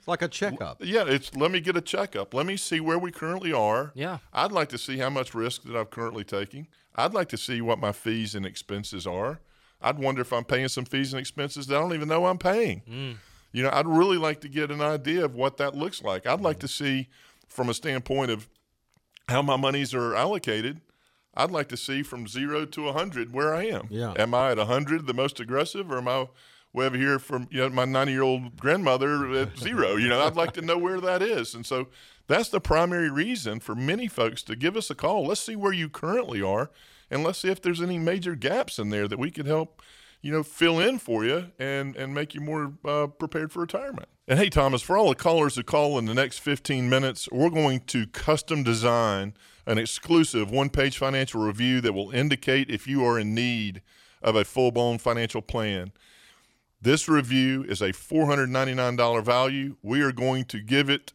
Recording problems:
none

